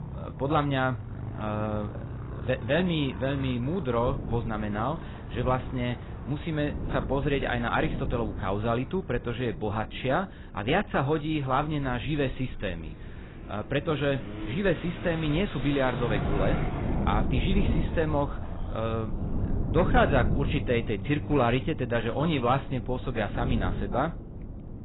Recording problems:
garbled, watery; badly; nothing above 4 kHz
traffic noise; noticeable; throughout; 10 dB below the speech
wind noise on the microphone; occasional gusts; 15 dB below the speech

